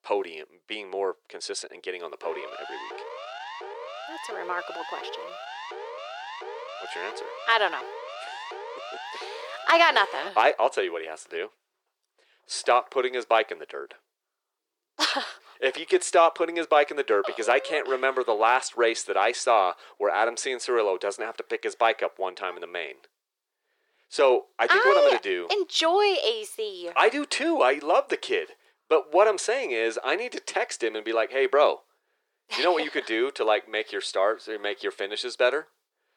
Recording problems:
thin; very; fading below 400 Hz
siren; faint; from 2 to 10 s; peak 10 dB below the speech

